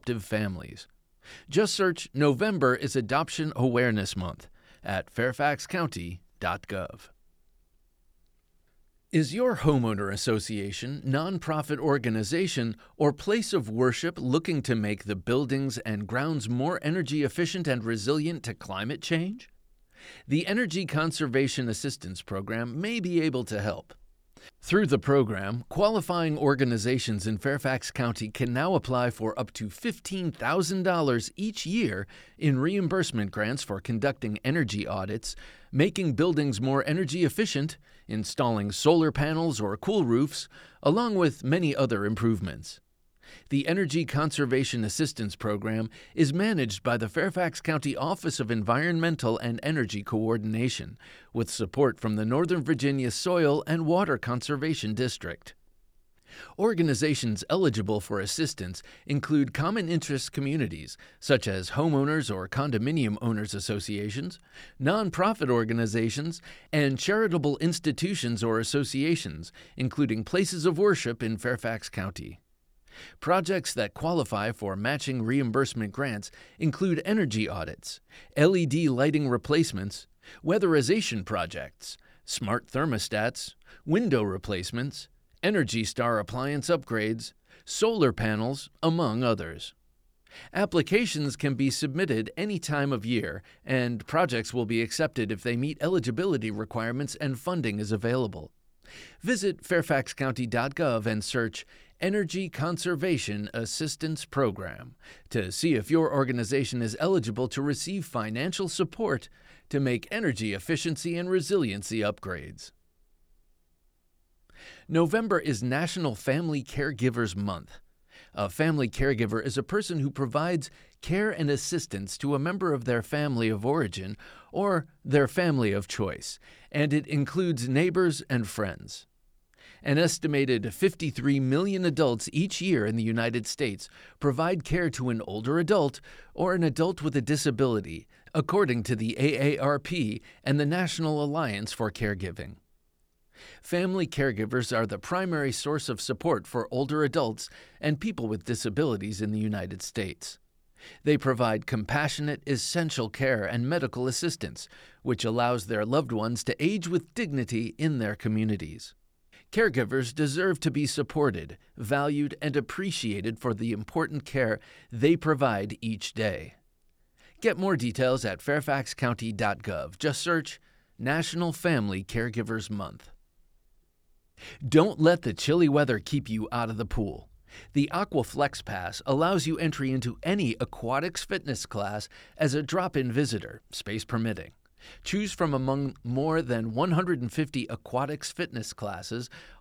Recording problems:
none

